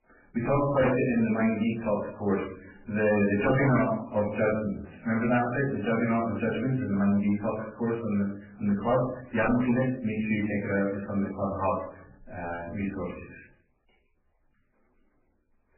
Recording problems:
off-mic speech; far
garbled, watery; badly; nothing above 2.5 kHz
room echo; noticeable; dies away in 0.5 s
distortion; slight; 4% of the sound clipped

